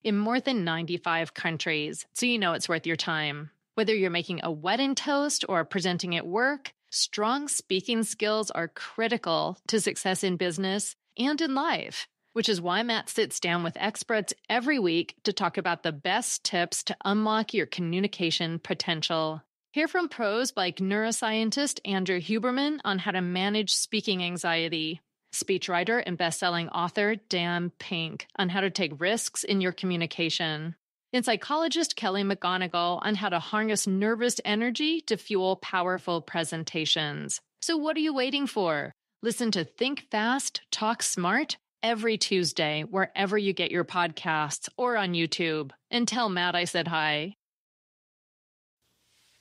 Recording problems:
none

